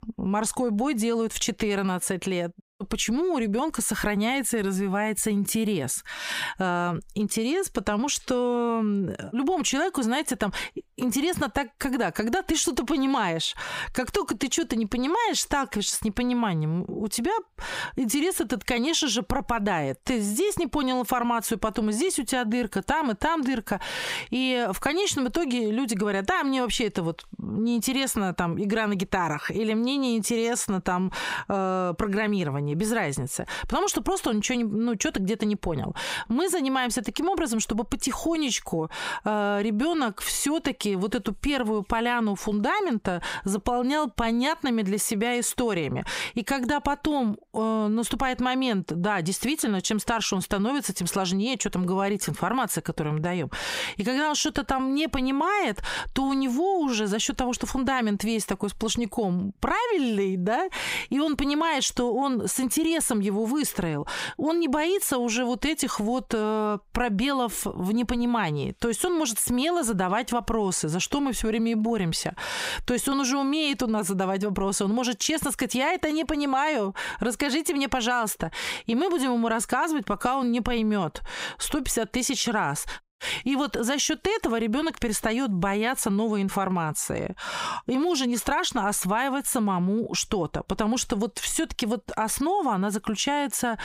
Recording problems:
squashed, flat; heavily

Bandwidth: 15.5 kHz